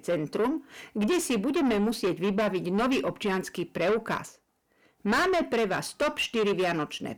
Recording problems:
distortion; heavy; 6 dB below the speech

